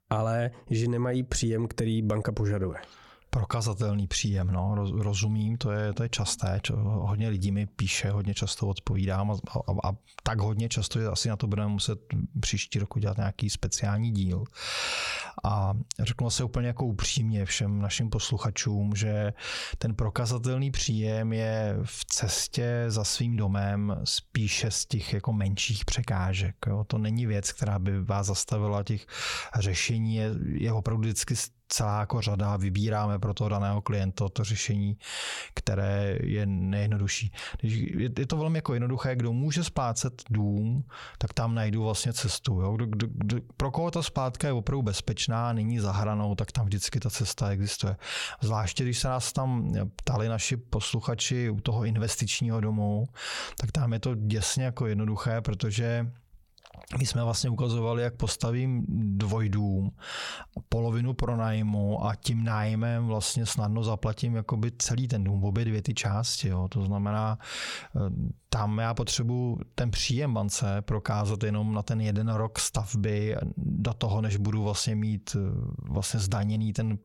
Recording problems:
squashed, flat; somewhat

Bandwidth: 17 kHz